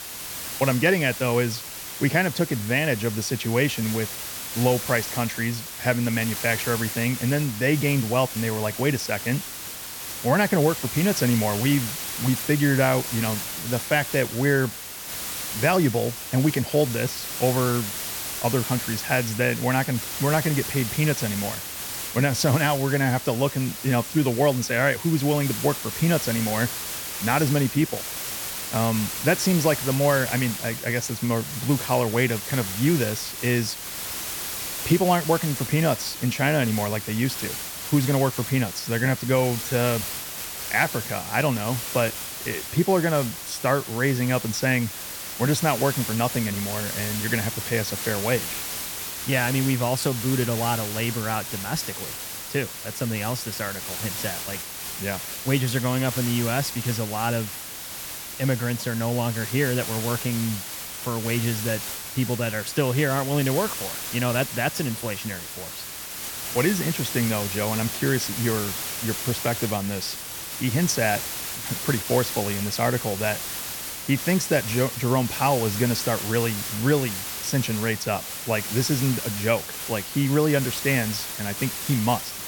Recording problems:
hiss; loud; throughout; 5 dB below the speech

